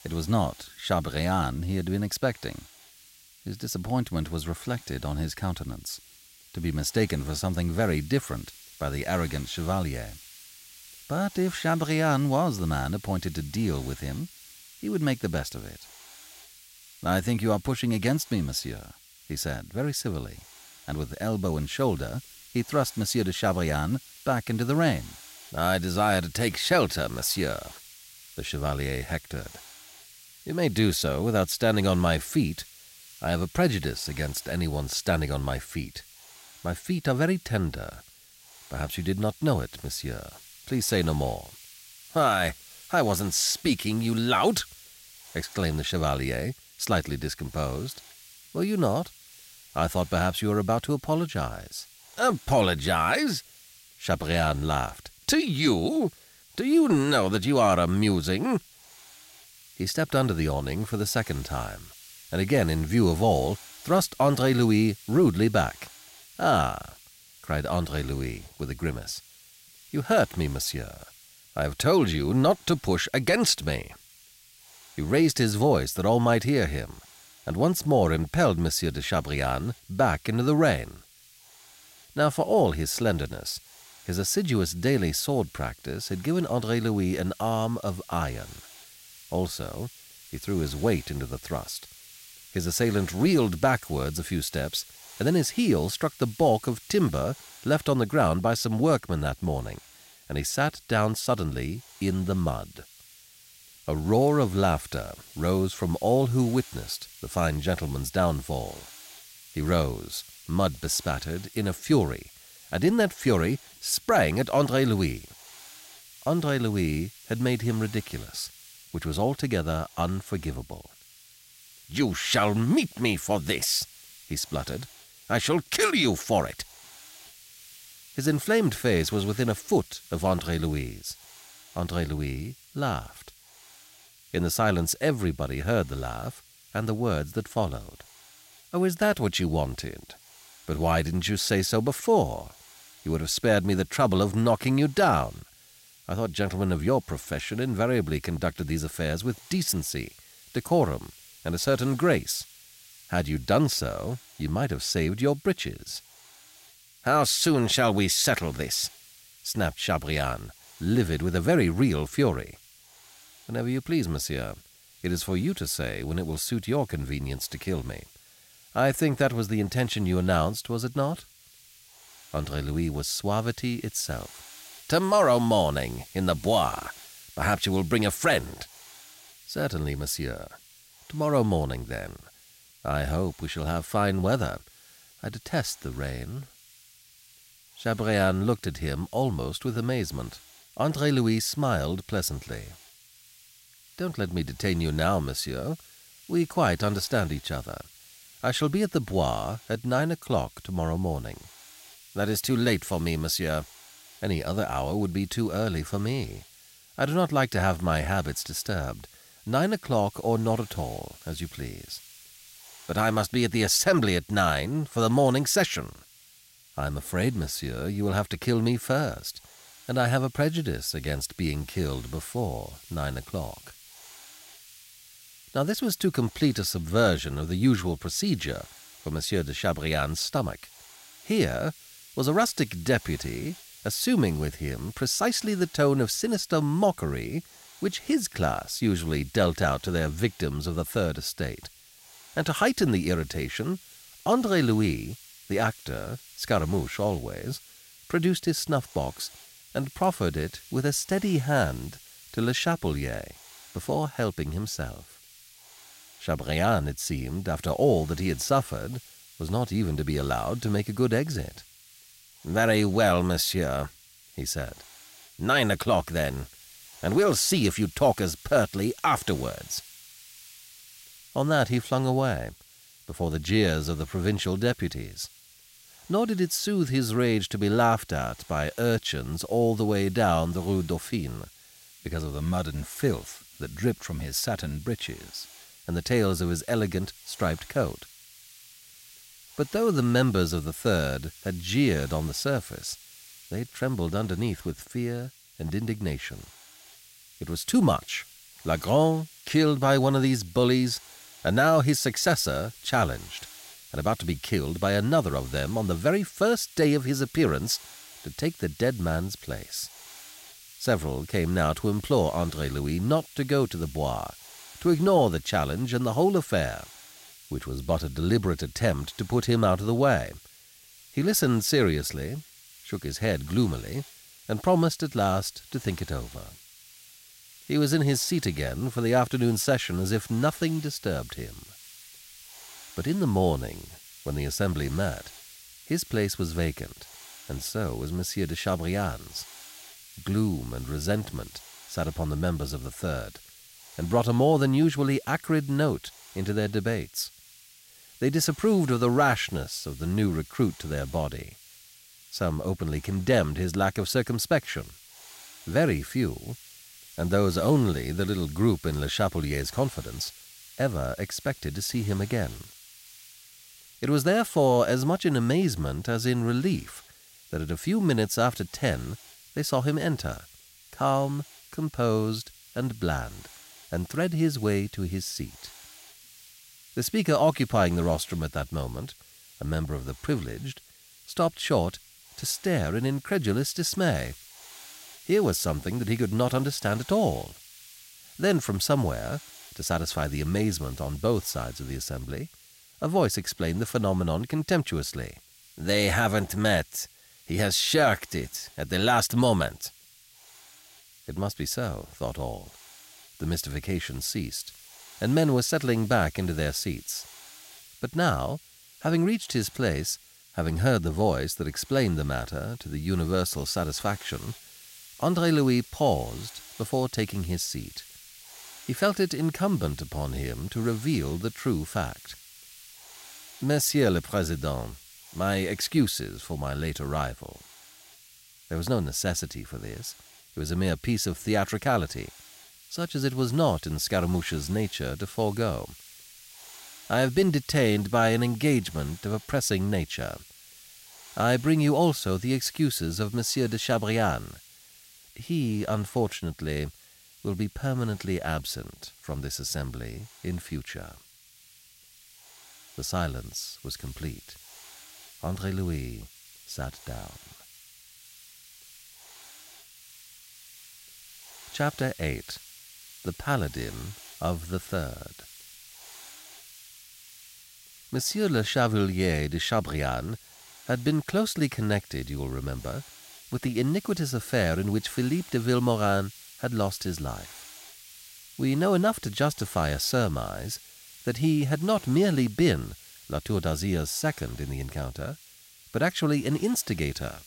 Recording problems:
hiss; faint; throughout; 20 dB below the speech

